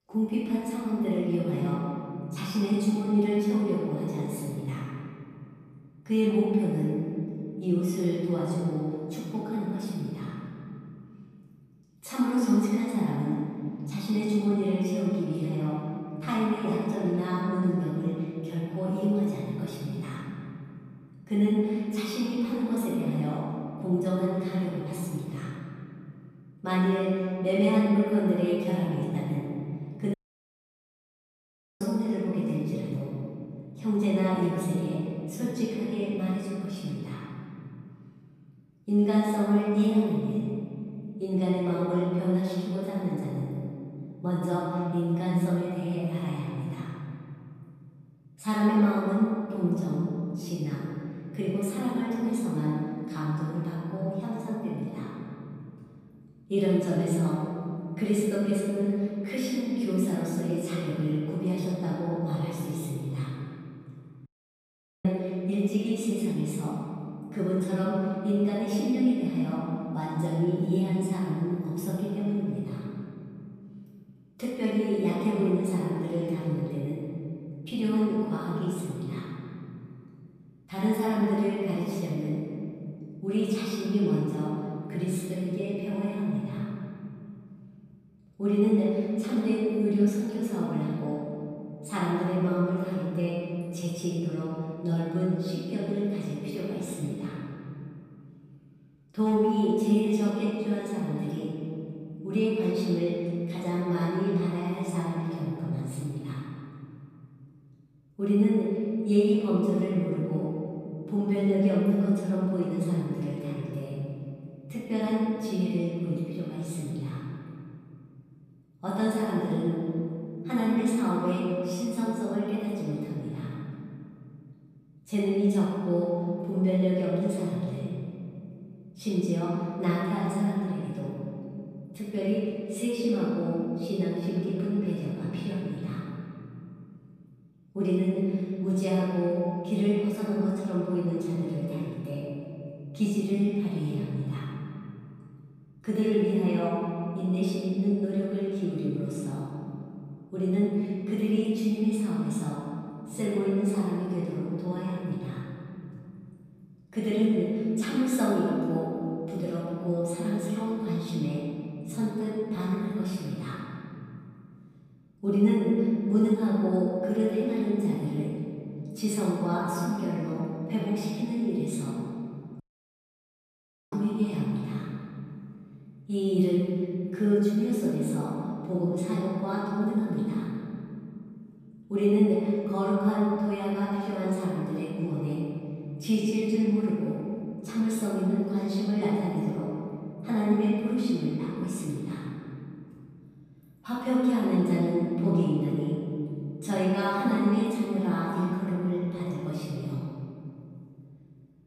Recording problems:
room echo; strong; dies away in 2.7 s
off-mic speech; far
audio cutting out; at 30 s for 1.5 s, at 1:04 for 1 s and at 2:53 for 1.5 s

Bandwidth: 14.5 kHz